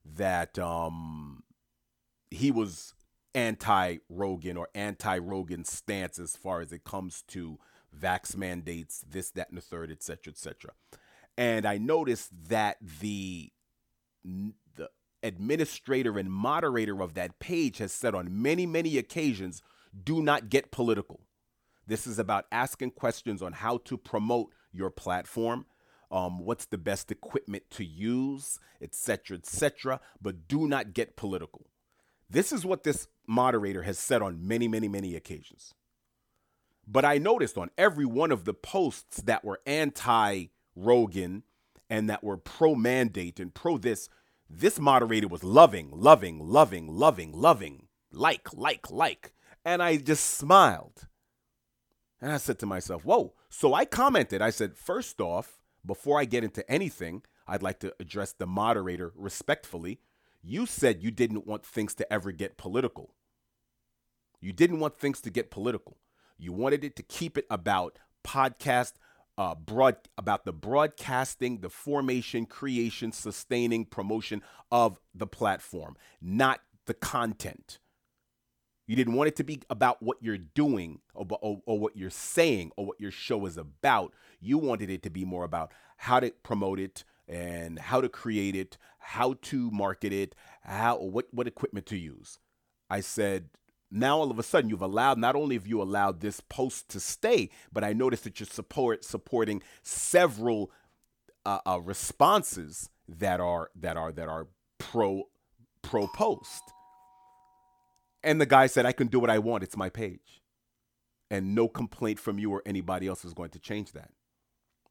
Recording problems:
doorbell; faint; from 1:46 to 1:47; peak 15 dB below the speech

